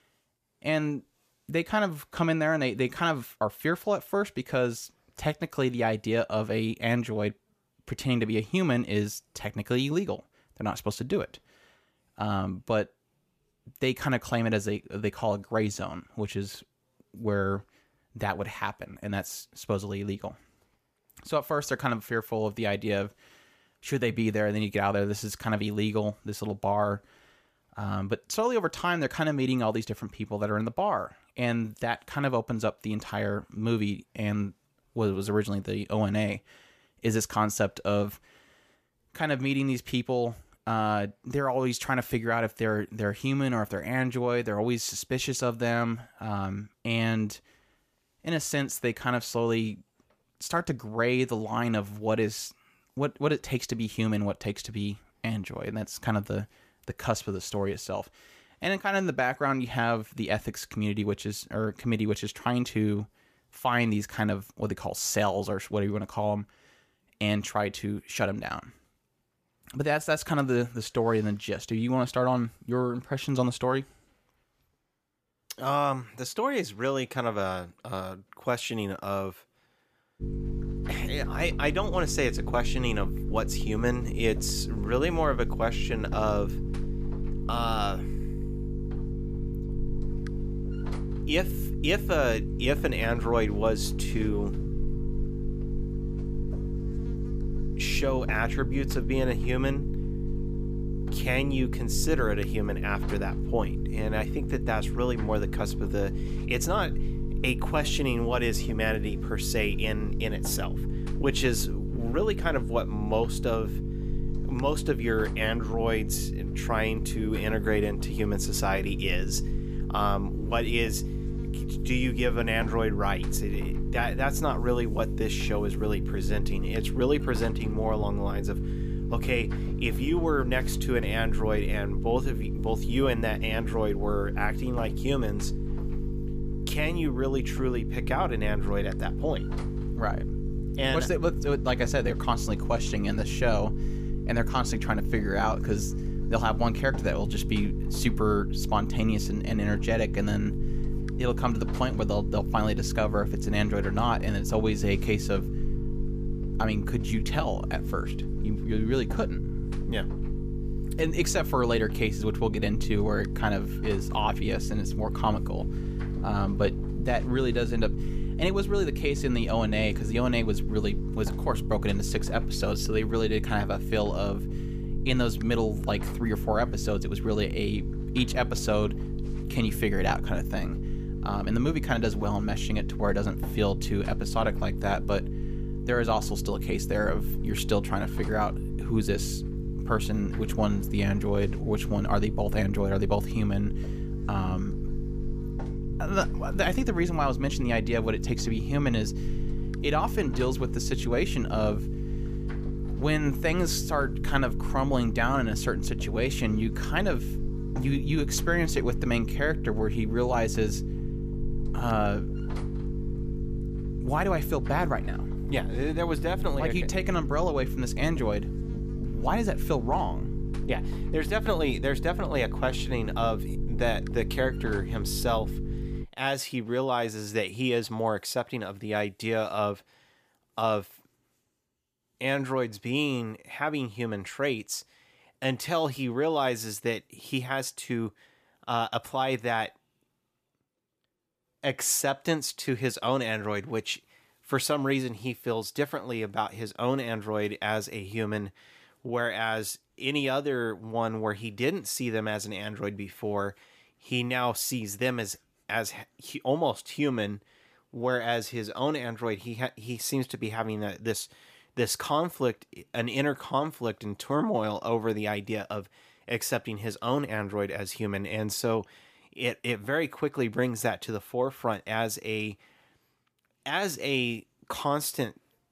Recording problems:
electrical hum; noticeable; from 1:20 to 3:46; 50 Hz, 10 dB below the speech

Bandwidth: 14.5 kHz